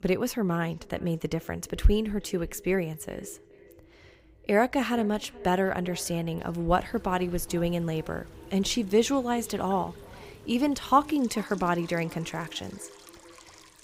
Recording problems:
echo of what is said; faint; throughout; 420 ms later, 20 dB below the speech
rain or running water; faint; from 6.5 s on; 25 dB below the speech

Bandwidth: 15.5 kHz